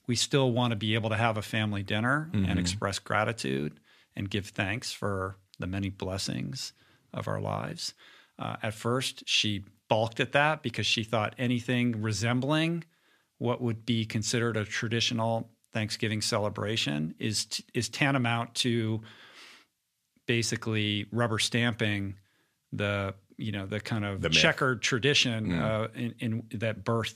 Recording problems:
none

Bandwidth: 14.5 kHz